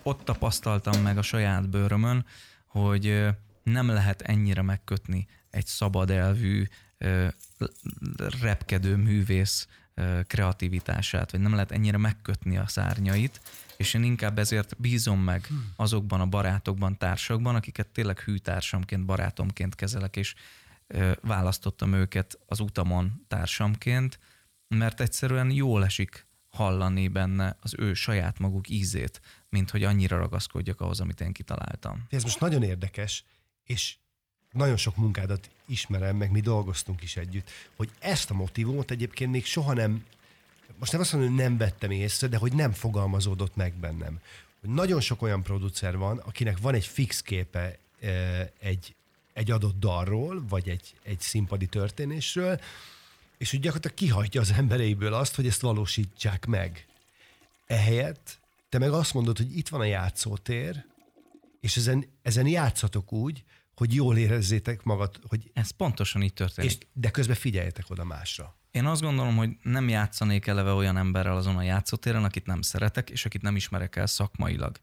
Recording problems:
household noises; faint; throughout; 25 dB below the speech

